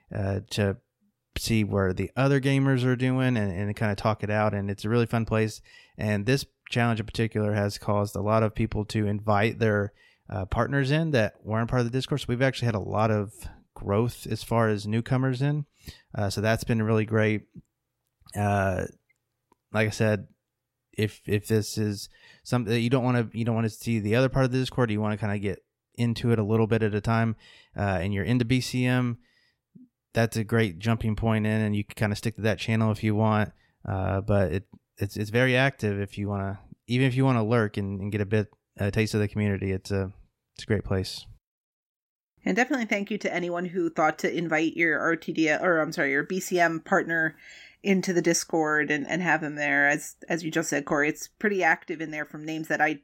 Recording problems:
none

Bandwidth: 16 kHz